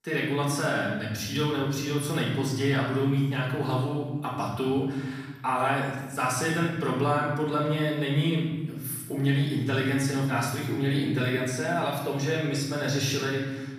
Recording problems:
off-mic speech; far
room echo; noticeable; dies away in 1.1 s

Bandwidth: 14.5 kHz